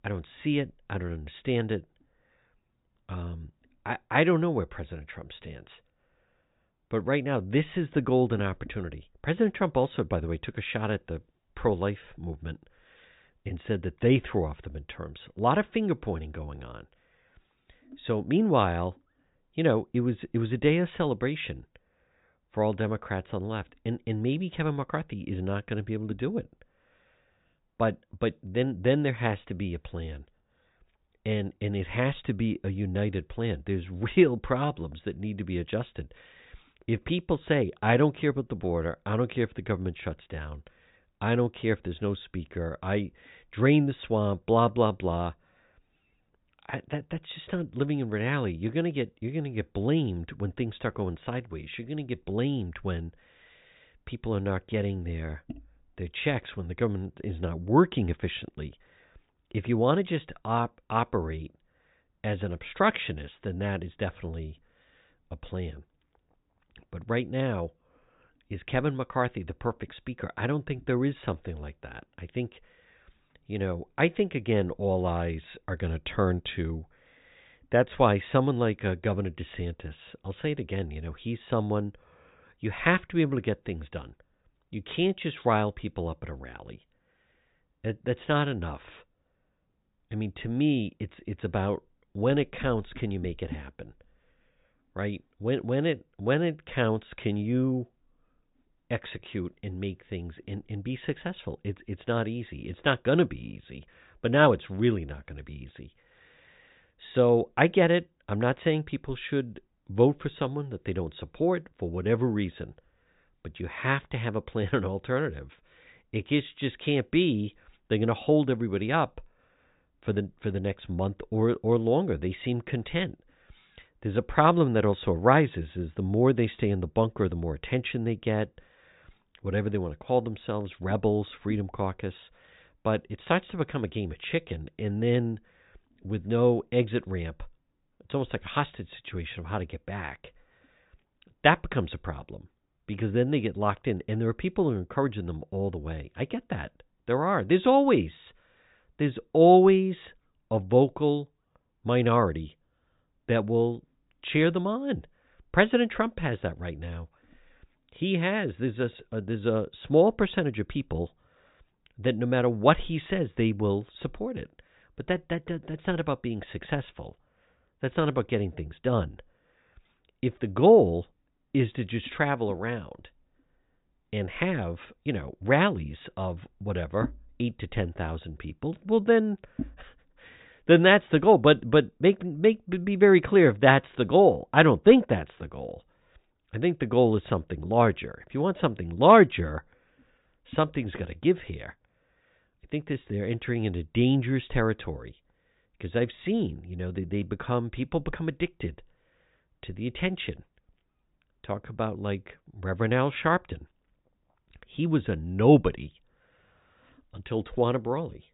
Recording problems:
high frequencies cut off; severe; nothing above 4 kHz

